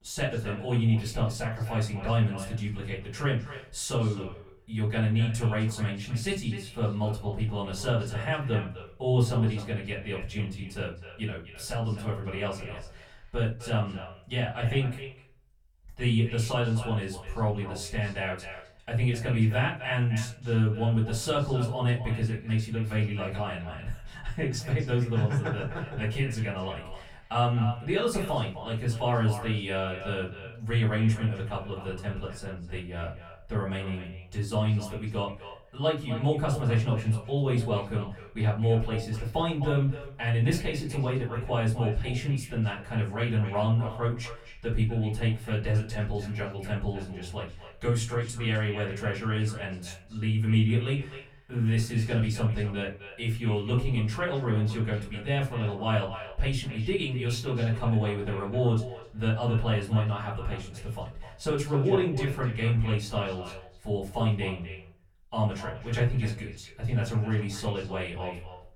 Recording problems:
off-mic speech; far
echo of what is said; noticeable; throughout; 260 ms later, 15 dB below the speech
room echo; slight; dies away in 0.4 s

